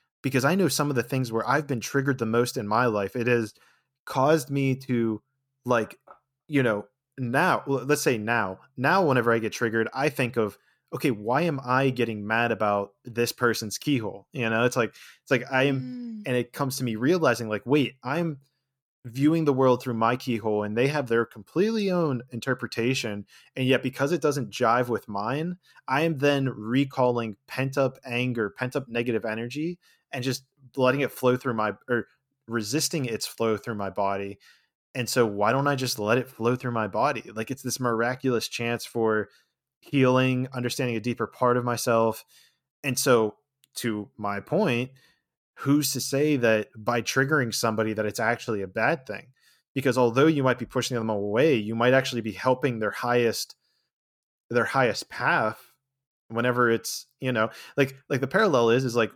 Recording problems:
none

